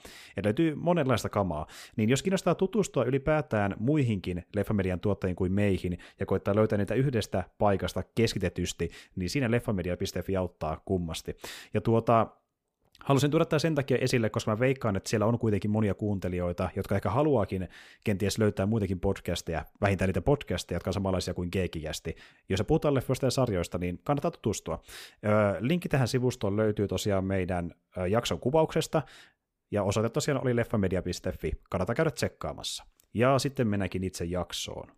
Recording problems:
none

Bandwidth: 15 kHz